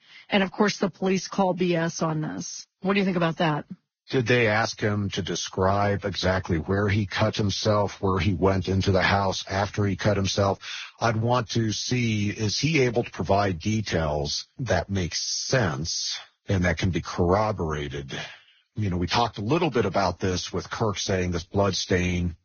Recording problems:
garbled, watery; badly; nothing above 6.5 kHz

